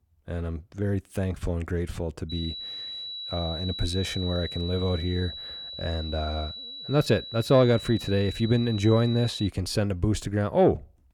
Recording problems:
high-pitched whine; loud; from 2.5 to 9.5 s; 4 kHz, 9 dB below the speech

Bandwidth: 18.5 kHz